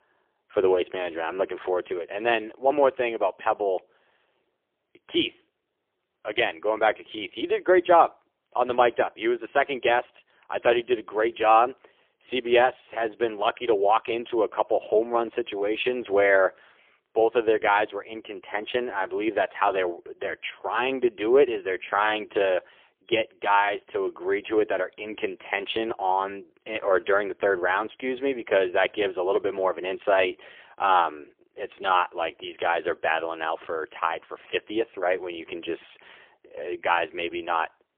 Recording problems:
phone-call audio; poor line; nothing above 3.5 kHz

